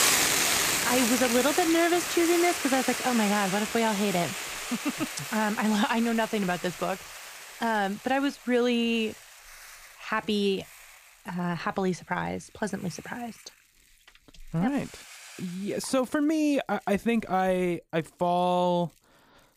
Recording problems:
hiss; loud; throughout; 1 dB below the speech

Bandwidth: 15 kHz